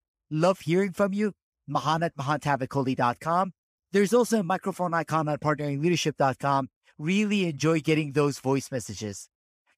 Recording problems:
none

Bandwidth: 15 kHz